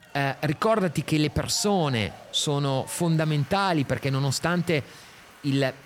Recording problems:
crowd noise; faint; throughout; 20 dB below the speech

